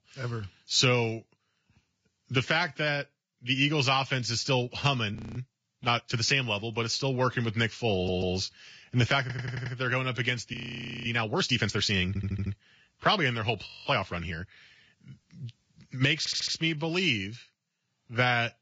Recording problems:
garbled, watery; badly; nothing above 7.5 kHz
audio freezing; at 5 s, at 11 s for 0.5 s and at 14 s
audio stuttering; 4 times, first at 8 s

